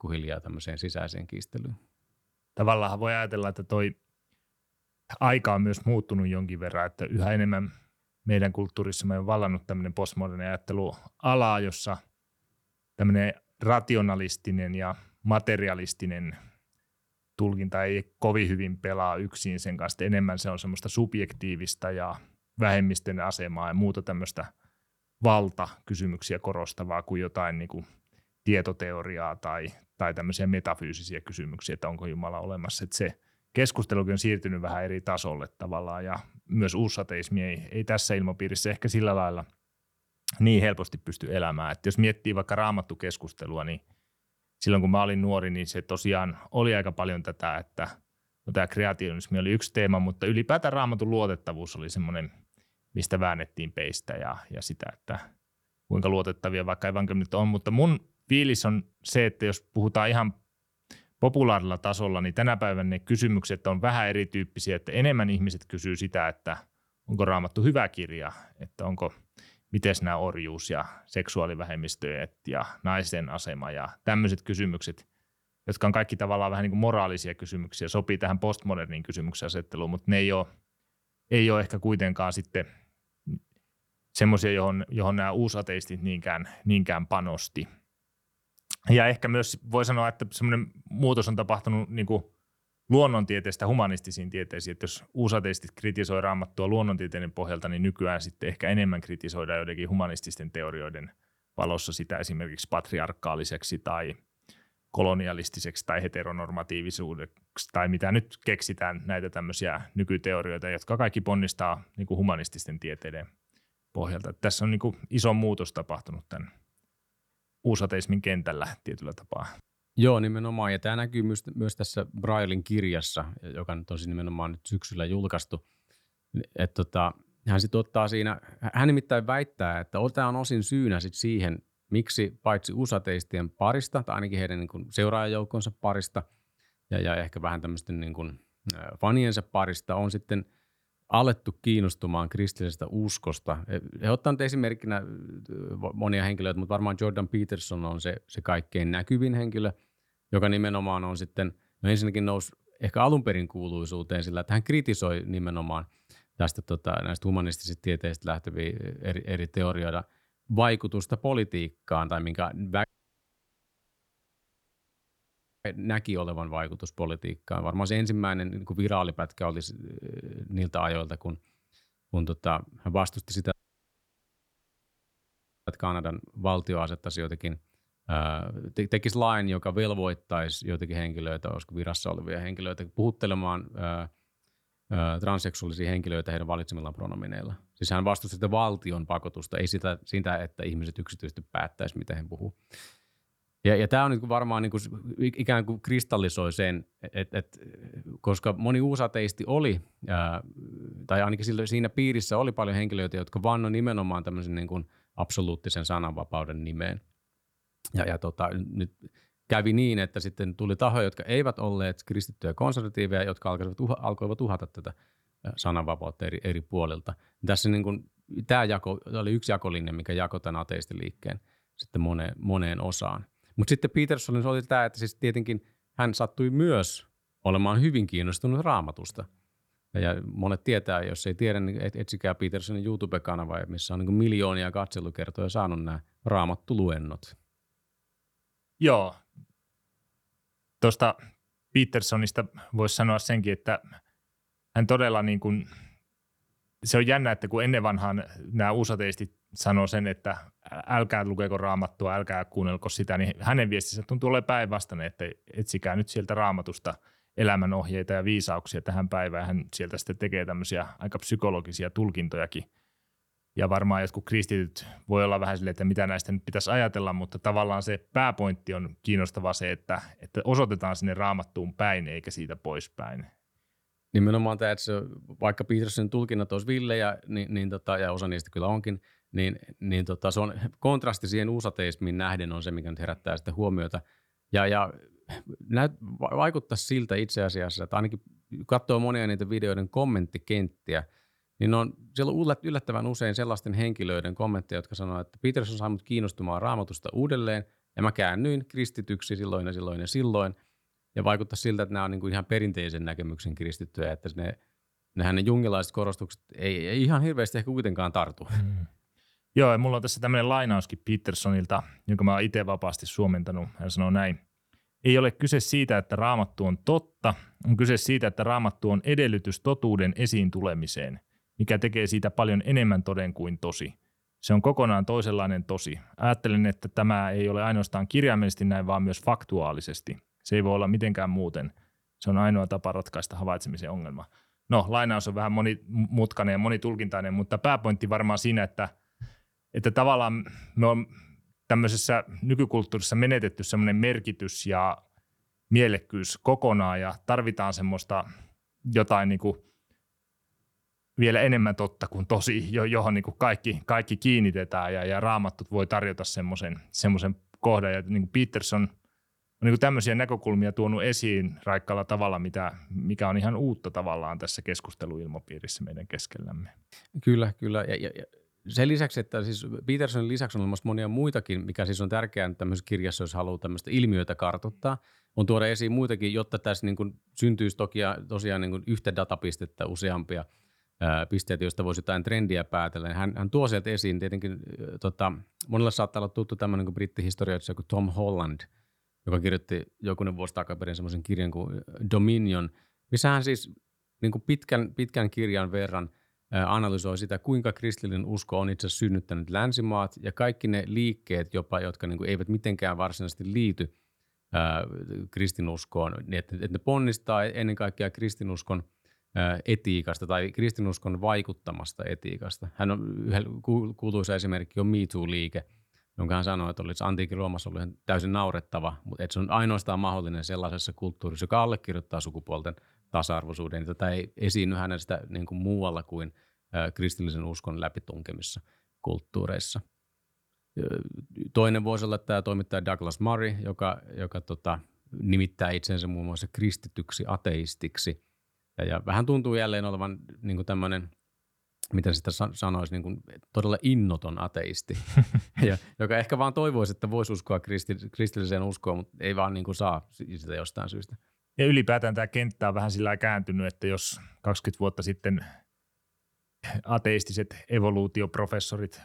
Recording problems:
audio cutting out; at 2:43 for 3 s and at 2:54 for 2 s

